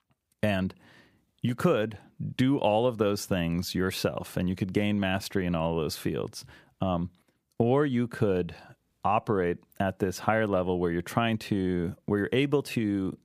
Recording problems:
none

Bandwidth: 15 kHz